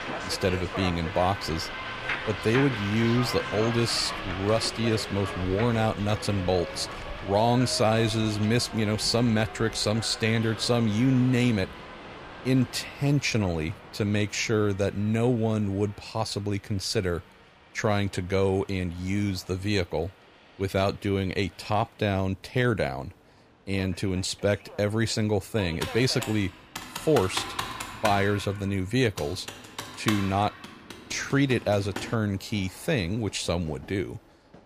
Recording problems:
train or aircraft noise; loud; throughout; 9 dB below the speech
keyboard typing; noticeable; from 26 to 32 s; peak 4 dB below the speech

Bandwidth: 15 kHz